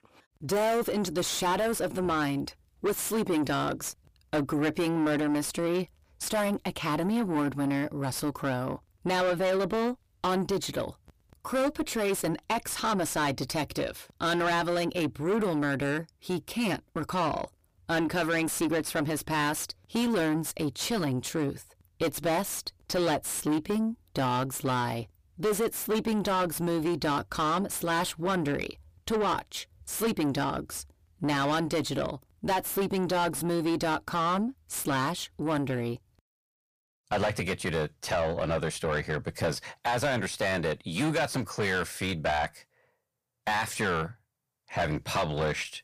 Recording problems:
distortion; heavy; 5 dB below the speech

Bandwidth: 15 kHz